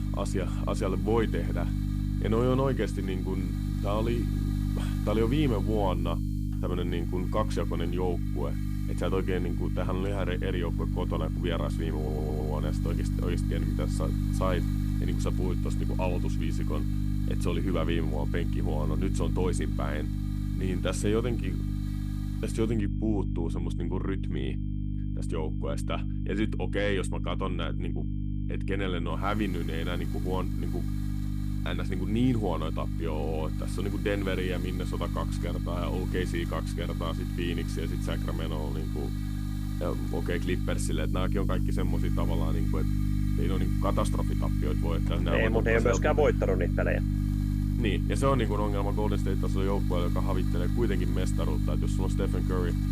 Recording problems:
electrical hum; loud; throughout; 50 Hz, 7 dB below the speech
hiss; noticeable; until 23 s and from 29 s on; 20 dB below the speech
high-pitched whine; faint; throughout; 3 kHz, 35 dB below the speech
audio stuttering; at 12 s

